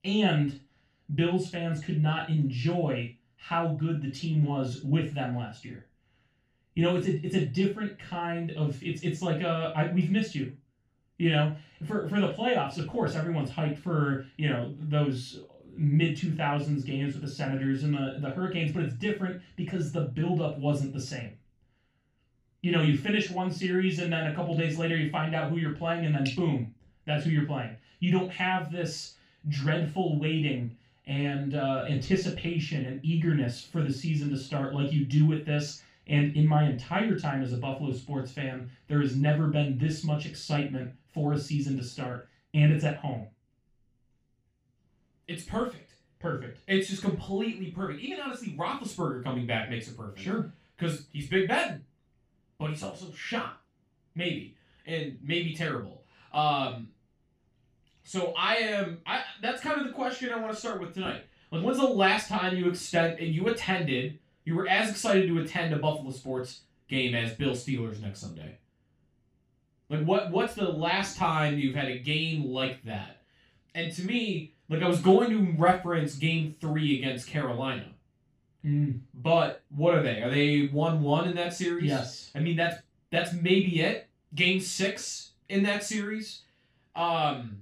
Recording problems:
off-mic speech; far
room echo; noticeable; dies away in 0.3 s

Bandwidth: 15 kHz